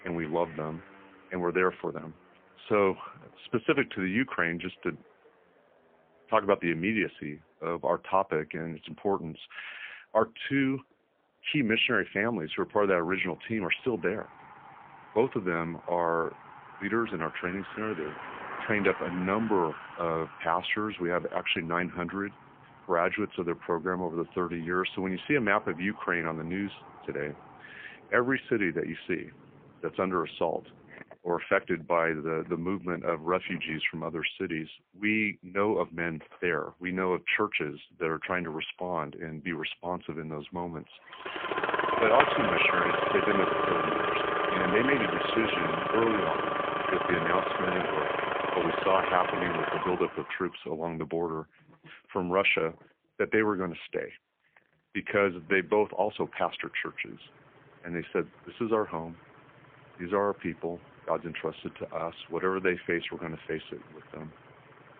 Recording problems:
phone-call audio; poor line; nothing above 3.5 kHz
traffic noise; loud; throughout; as loud as the speech

